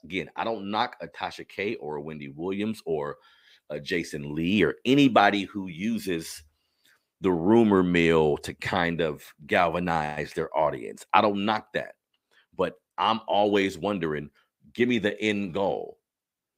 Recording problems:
none

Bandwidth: 15.5 kHz